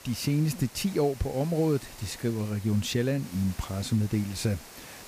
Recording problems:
hiss; noticeable; throughout; 15 dB below the speech

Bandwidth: 15 kHz